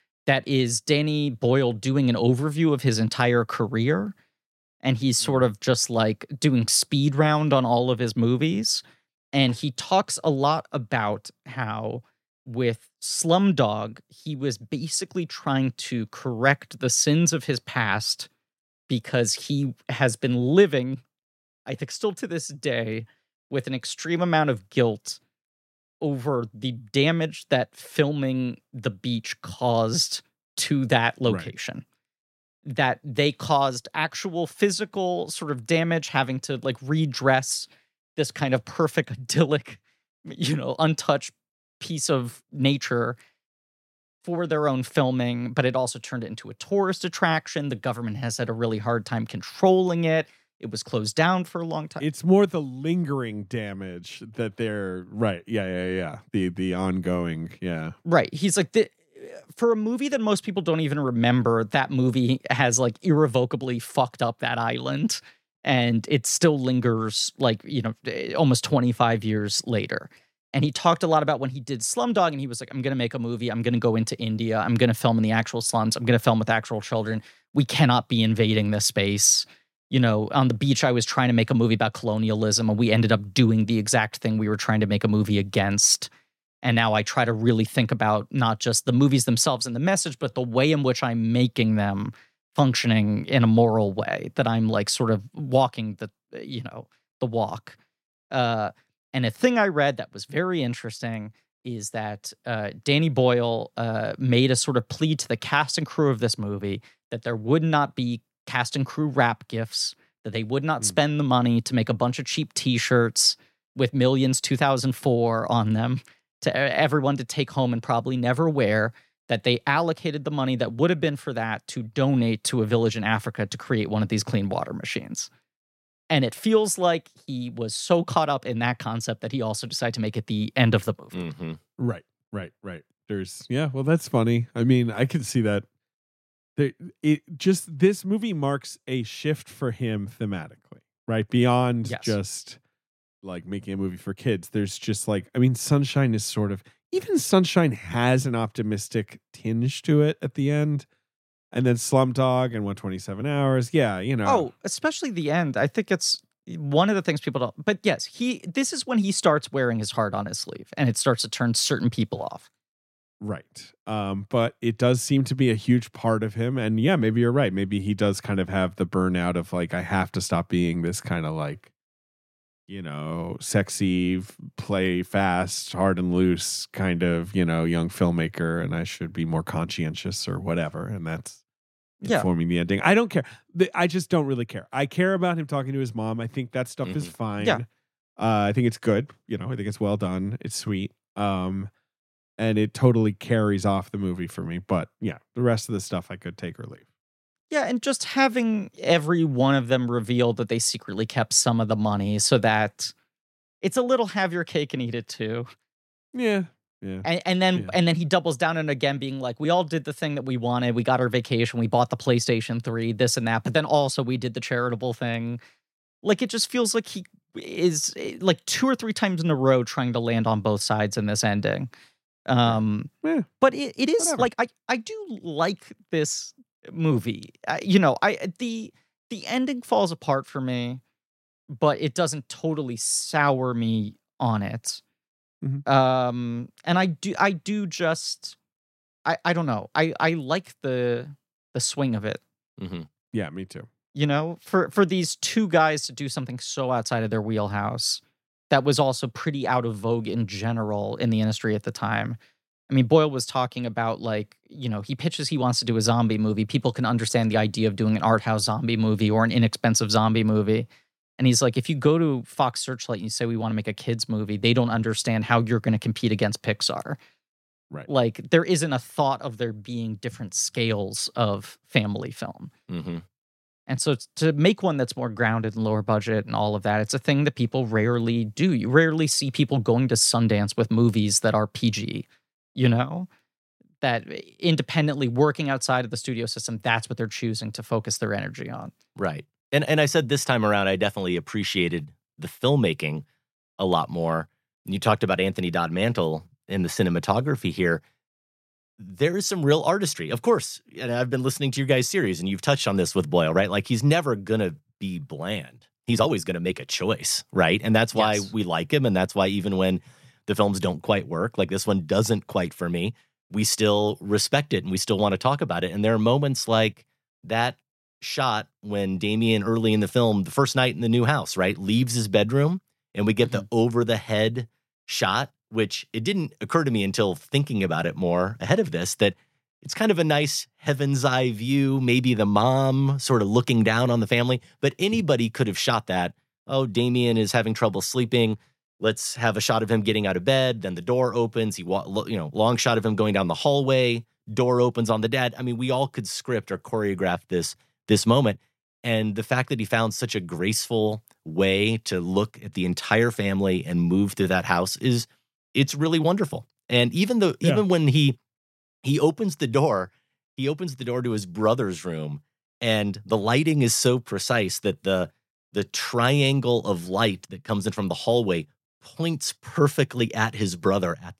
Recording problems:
uneven, jittery; strongly; from 1:03 to 5:07

